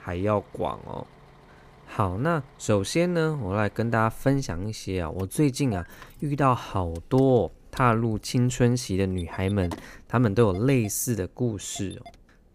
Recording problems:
traffic noise; faint; throughout; 25 dB below the speech

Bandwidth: 15 kHz